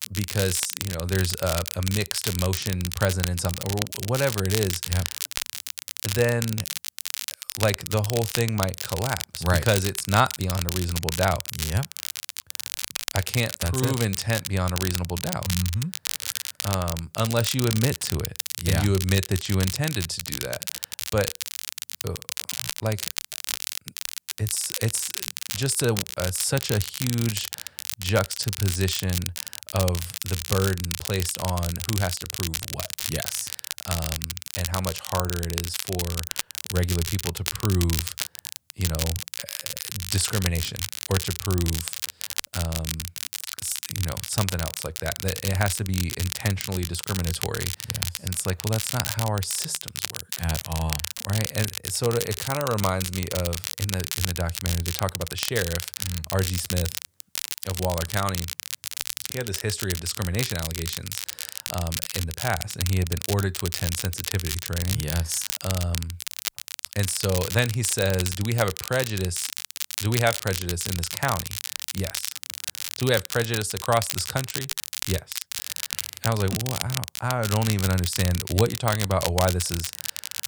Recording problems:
crackle, like an old record; loud; 3 dB below the speech

